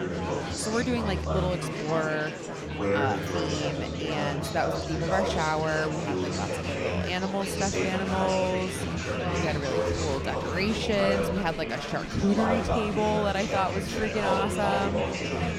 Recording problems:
murmuring crowd; very loud; throughout; as loud as the speech

